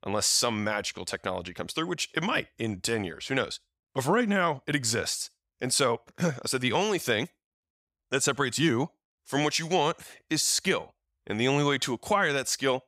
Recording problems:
none

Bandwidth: 15.5 kHz